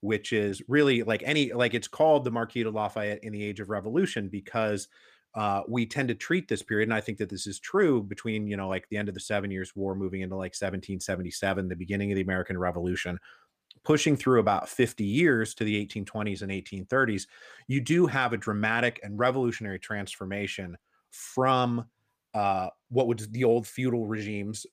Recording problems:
none

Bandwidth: 15 kHz